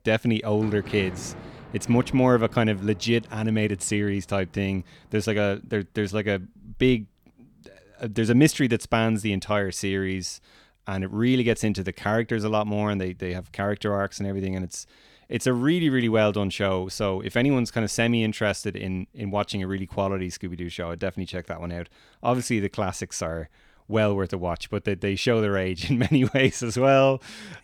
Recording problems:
rain or running water; noticeable; throughout; 20 dB below the speech

